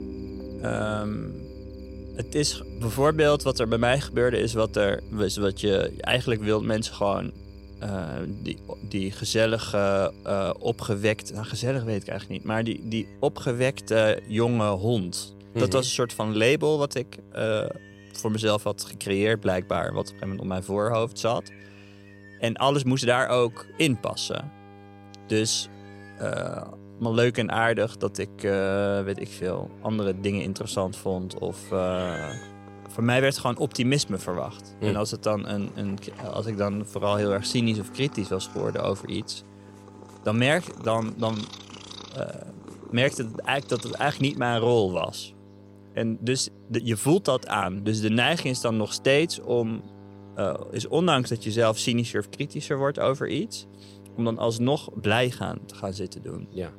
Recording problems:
electrical hum; faint; throughout; 50 Hz, 25 dB below the speech
animal sounds; faint; throughout; 25 dB below the speech
background music; faint; throughout; 20 dB below the speech

